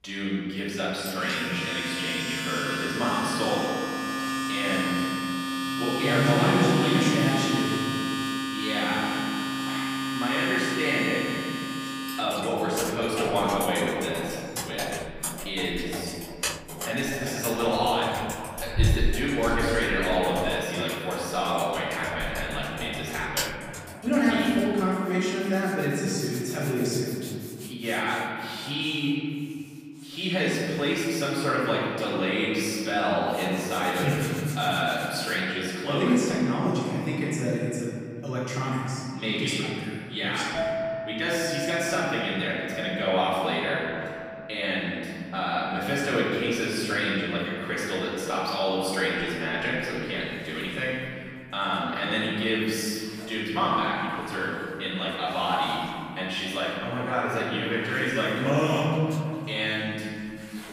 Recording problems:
room echo; strong; dies away in 2.4 s
off-mic speech; far
household noises; loud; throughout; 5 dB below the speech

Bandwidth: 15 kHz